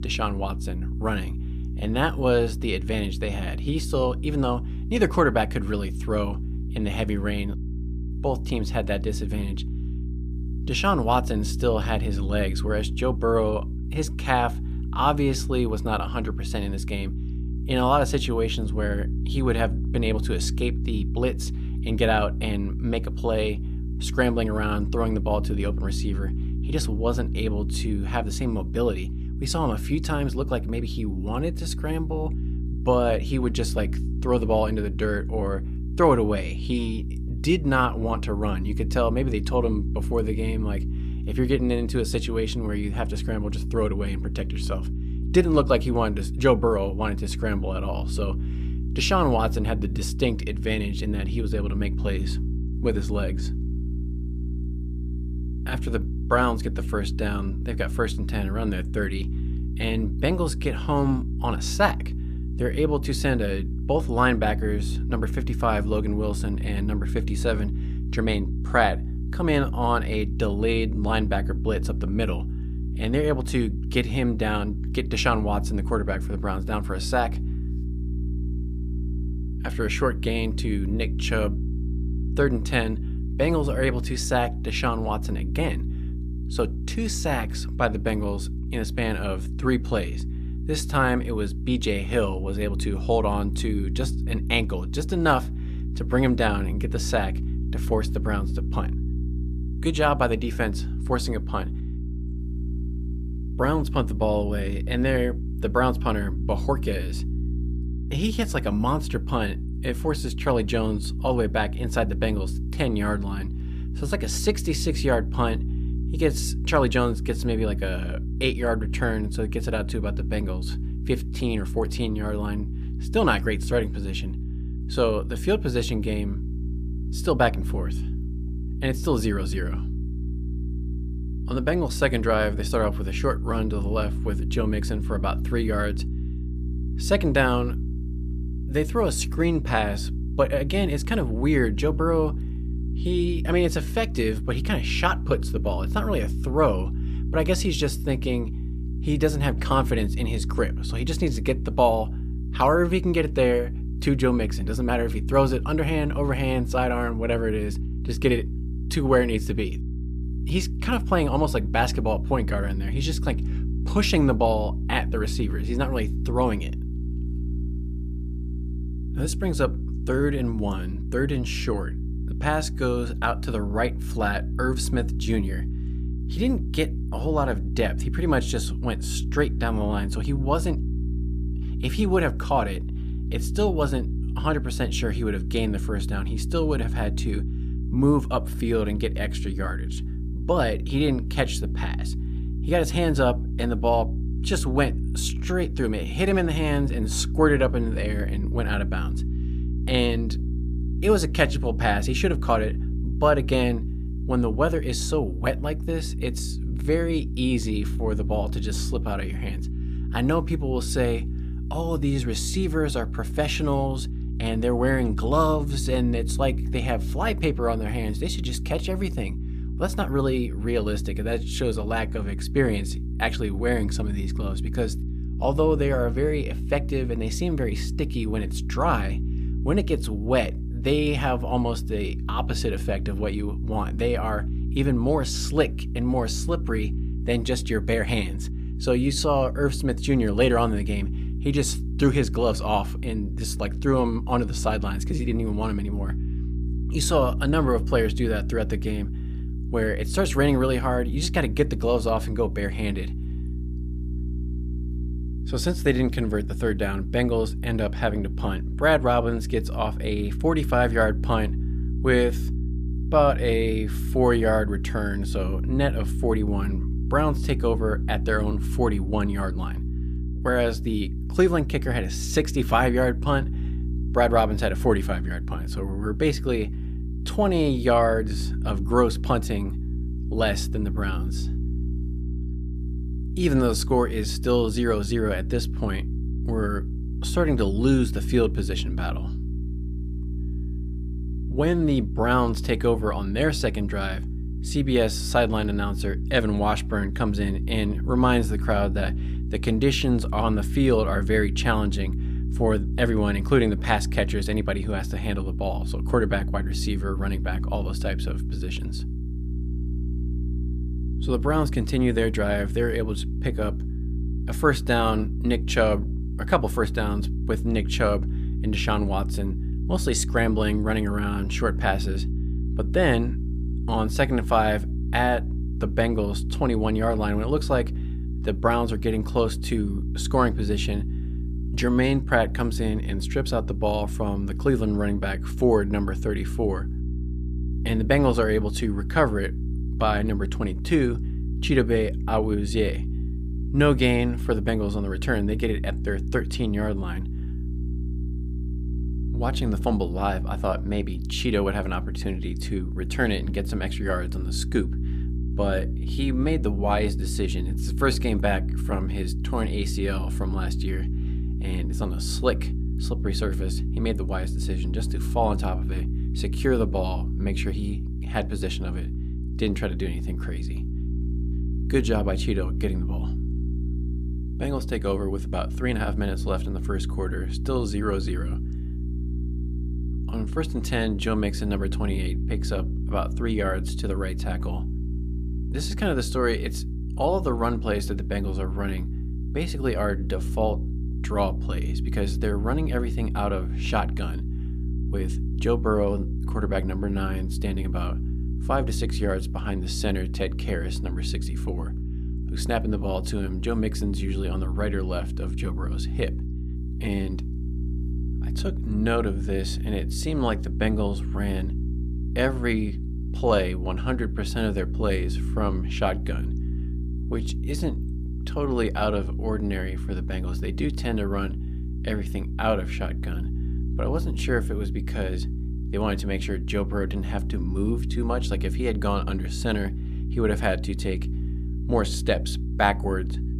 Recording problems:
electrical hum; noticeable; throughout; 60 Hz, 15 dB below the speech

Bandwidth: 14.5 kHz